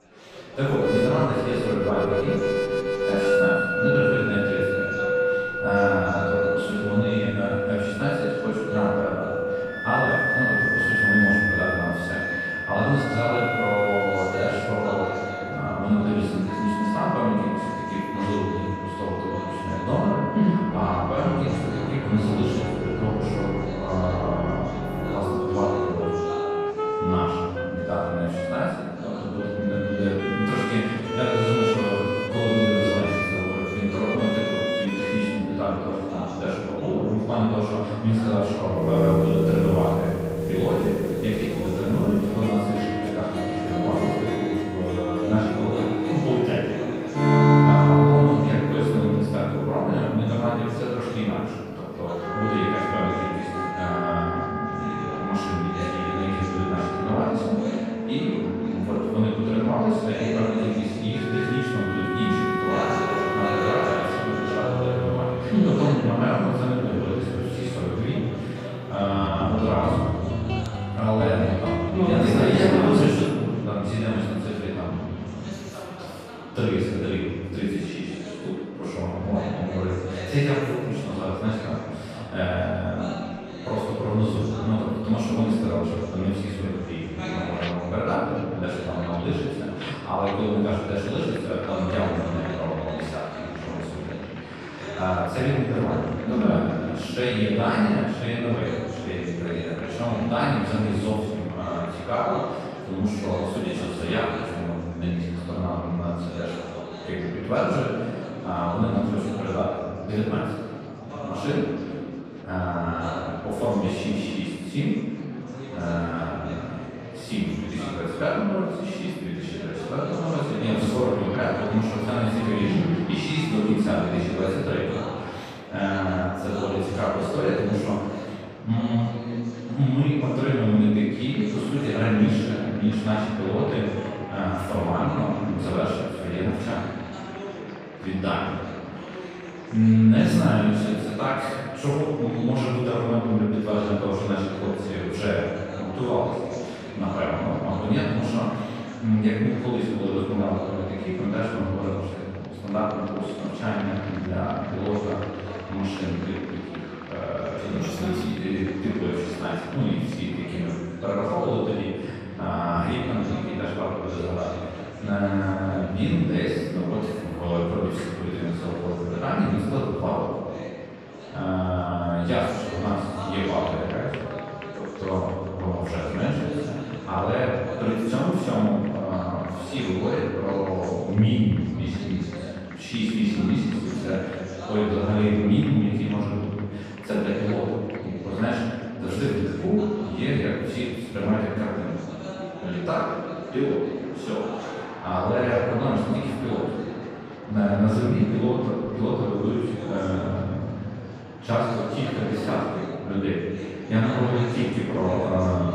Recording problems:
room echo; strong; dies away in 1.8 s
off-mic speech; far
background music; loud; until 1:13; 1 dB below the speech
murmuring crowd; noticeable; throughout; 15 dB below the speech

